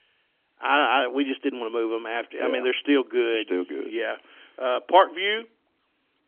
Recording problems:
phone-call audio; nothing above 3.5 kHz

